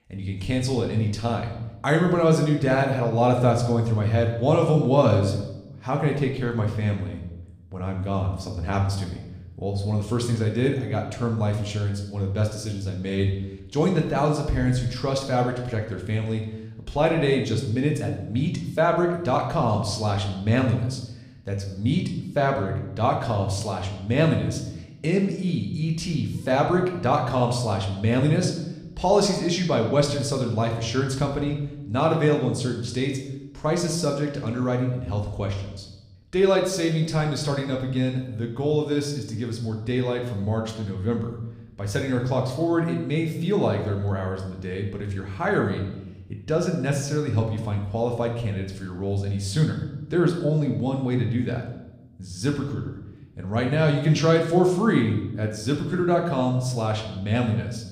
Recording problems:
room echo; slight; dies away in 0.8 s
off-mic speech; somewhat distant

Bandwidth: 15 kHz